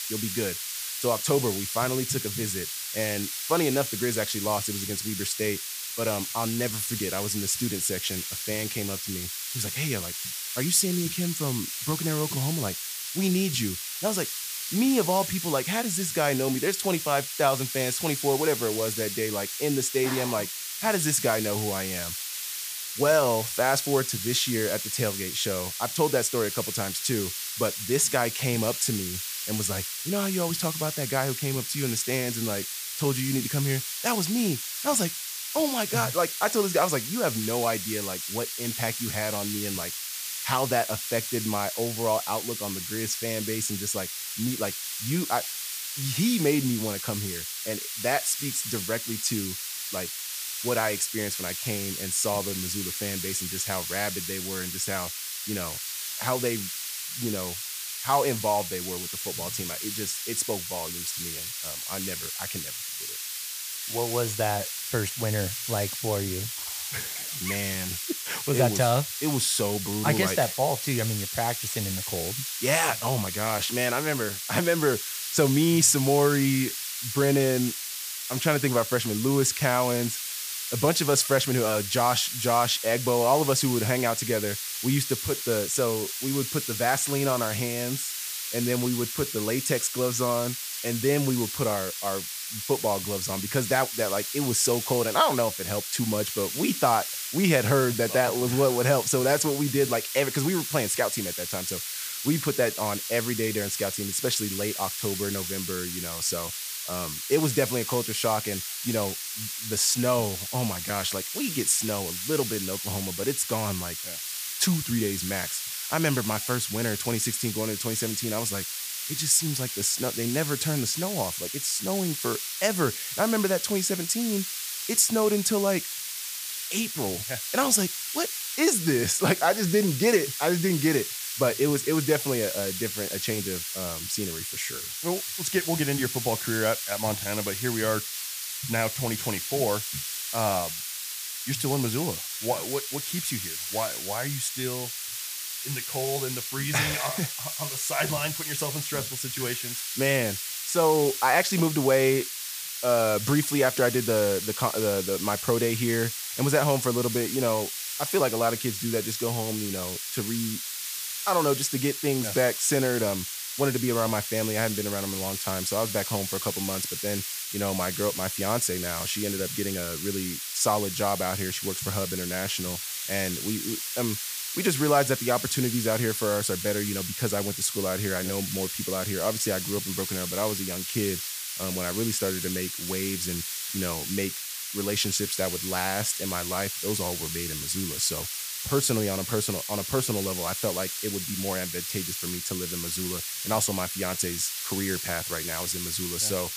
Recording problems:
hiss; loud; throughout; 3 dB below the speech

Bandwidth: 15 kHz